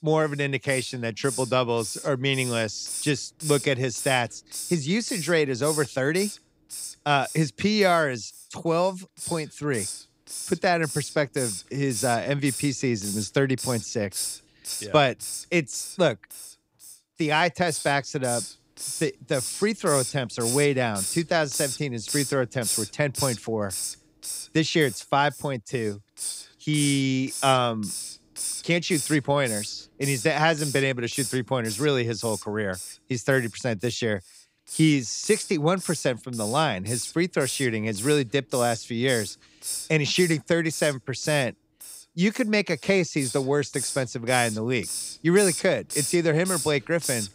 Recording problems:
hiss; loud; throughout; 7 dB below the speech

